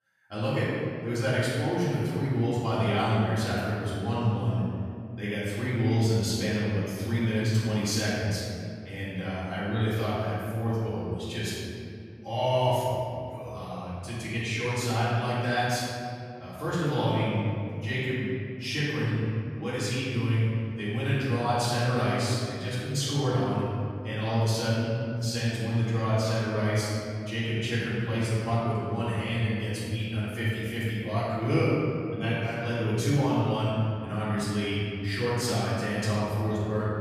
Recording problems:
room echo; strong; dies away in 2.7 s
off-mic speech; far

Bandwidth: 14.5 kHz